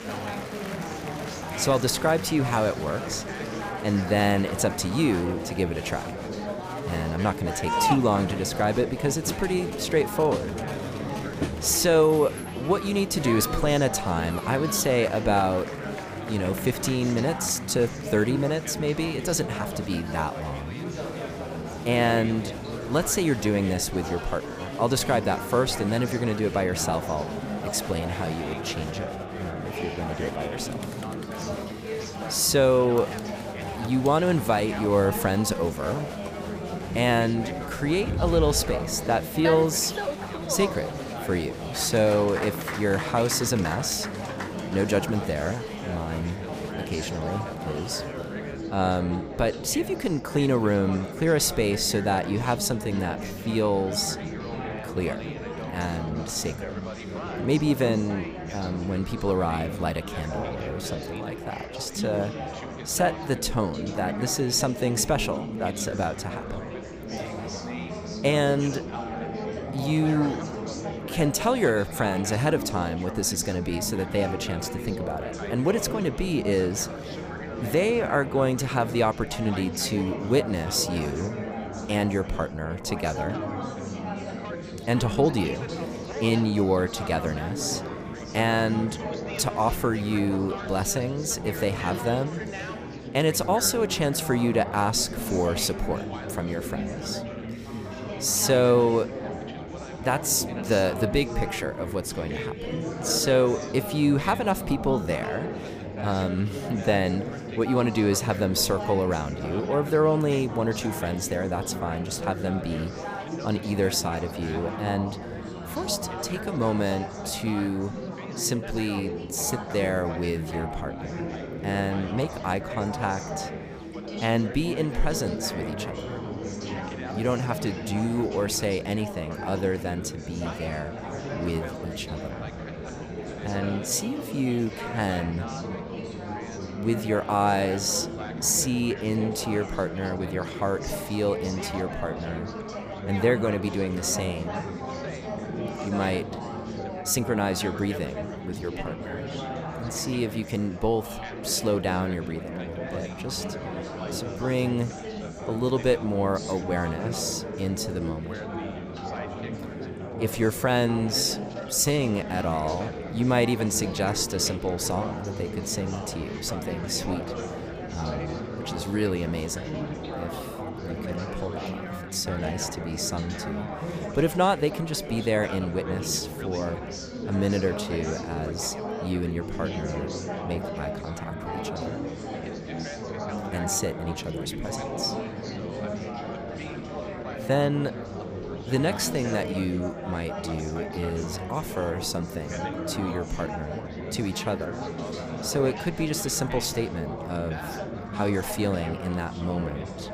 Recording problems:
chatter from many people; loud; throughout; 7 dB below the speech

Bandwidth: 15 kHz